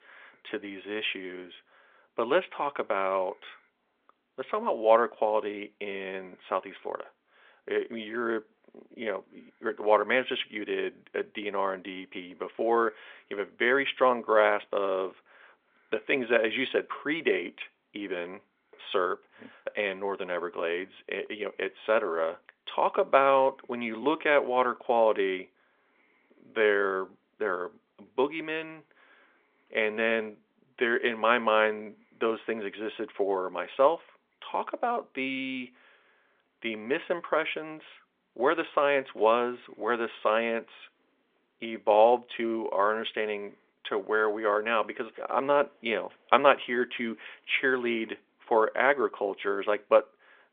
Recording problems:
phone-call audio; nothing above 3.5 kHz

